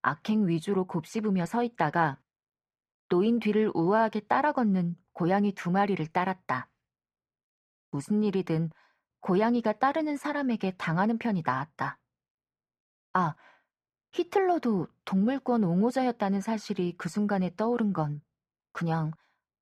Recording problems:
muffled; very; fading above 3 kHz

